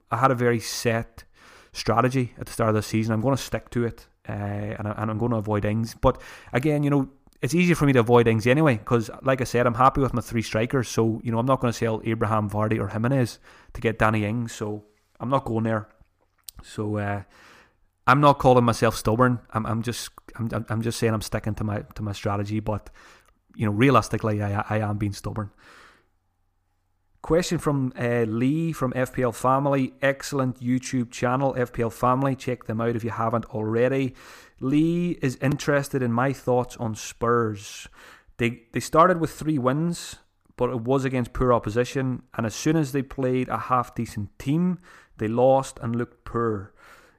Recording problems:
none

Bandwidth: 15 kHz